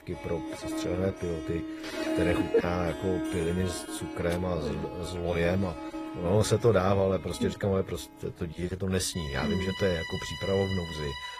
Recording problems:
garbled, watery; slightly; nothing above 14.5 kHz
background music; loud; throughout; 7 dB below the speech

